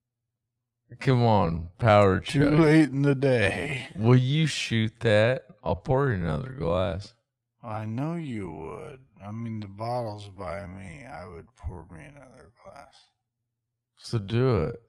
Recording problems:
wrong speed, natural pitch; too slow; 0.5 times normal speed

